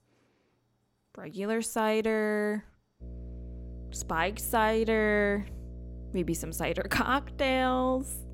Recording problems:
electrical hum; faint; from 3 s on; 60 Hz, 25 dB below the speech

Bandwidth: 16.5 kHz